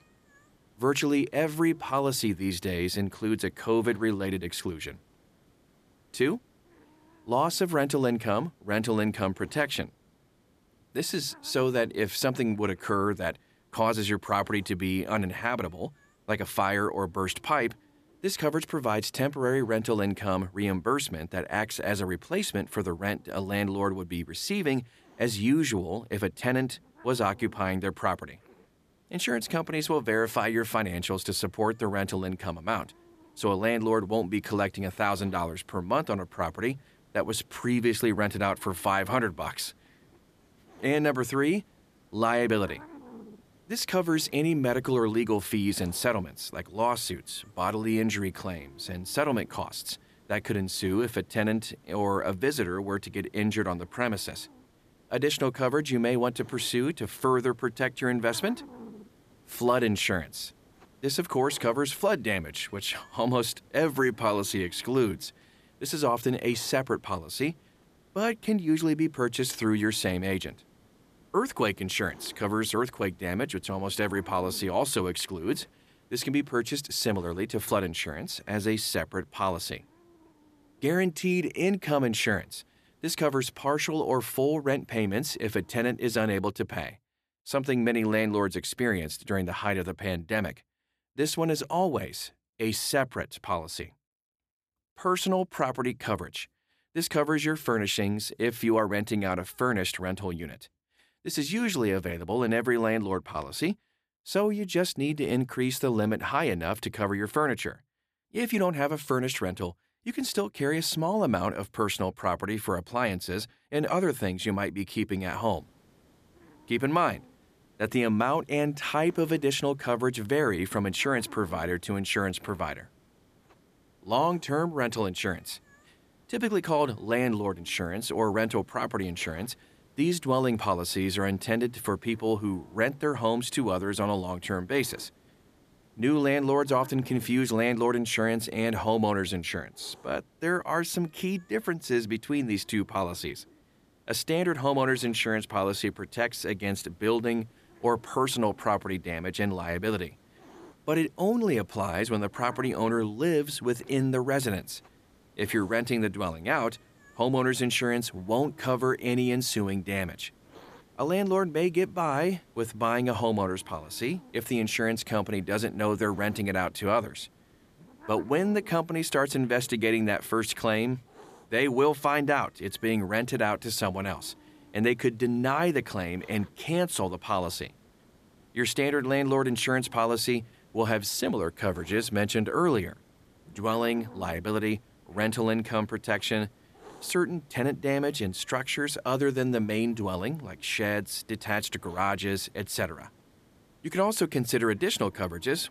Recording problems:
hiss; faint; until 1:26 and from 1:55 on; 30 dB below the speech

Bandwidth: 14.5 kHz